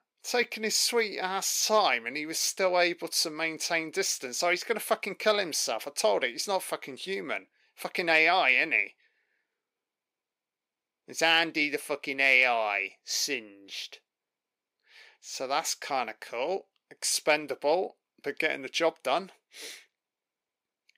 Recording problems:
thin; somewhat; fading below 400 Hz

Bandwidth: 15.5 kHz